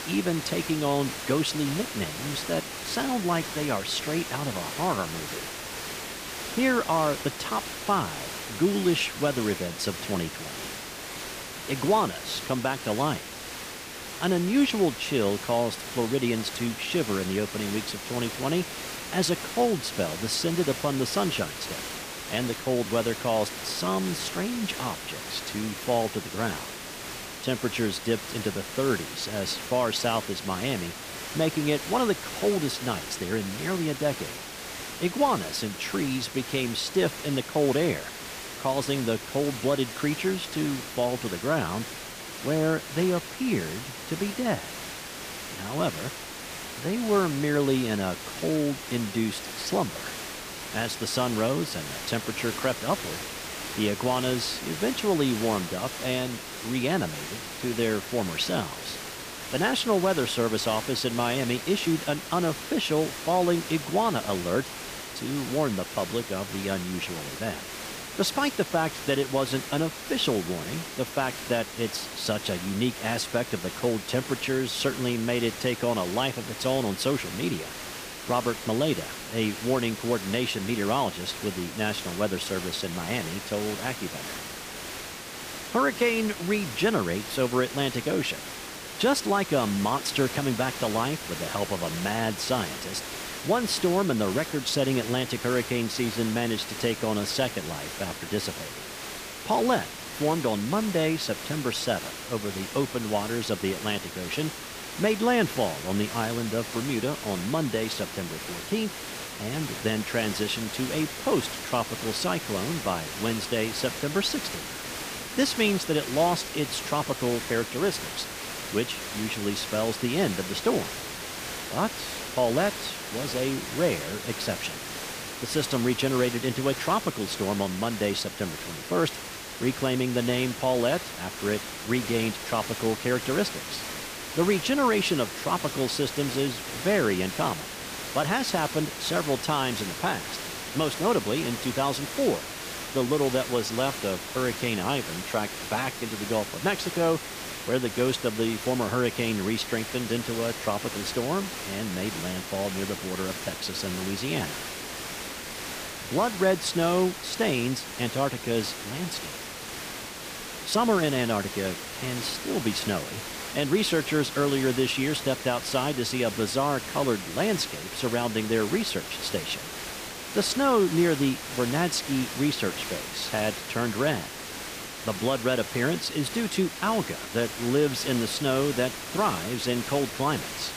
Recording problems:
hiss; loud; throughout; 7 dB below the speech

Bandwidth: 15 kHz